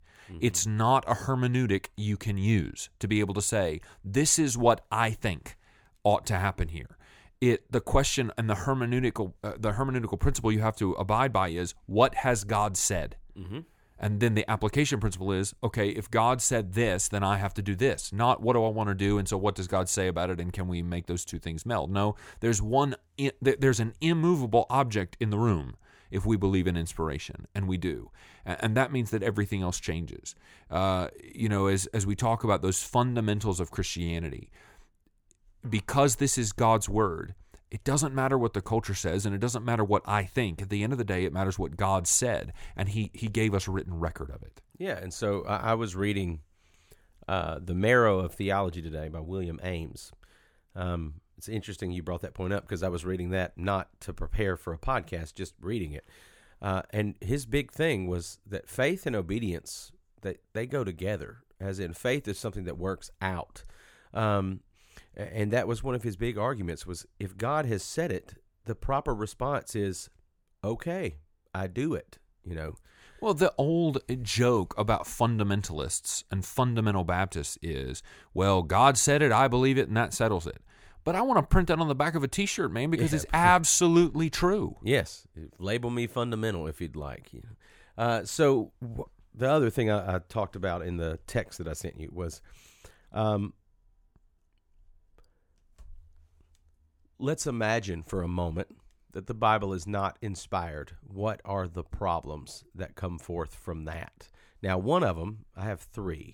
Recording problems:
none

